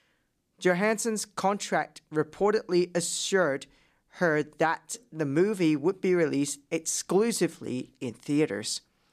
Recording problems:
none

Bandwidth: 14.5 kHz